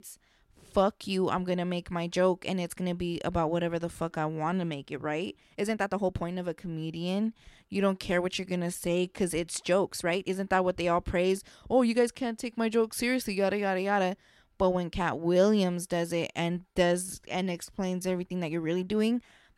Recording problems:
uneven, jittery; strongly; from 4 to 19 s

